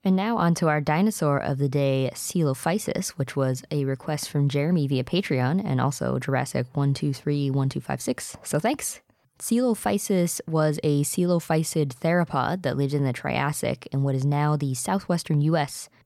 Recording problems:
none

